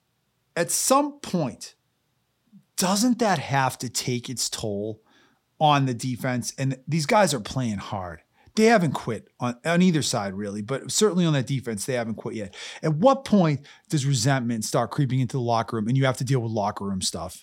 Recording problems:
none

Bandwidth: 16.5 kHz